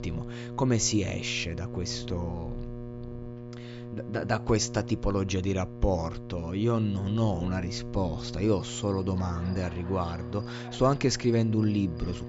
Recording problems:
high frequencies cut off; noticeable; nothing above 7.5 kHz
electrical hum; noticeable; throughout; 60 Hz, 15 dB below the speech
animal sounds; faint; throughout; 20 dB below the speech

